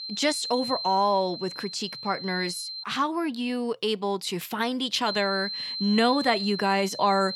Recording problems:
high-pitched whine; loud; until 3 s and from 5 s on; 4 kHz, 6 dB below the speech

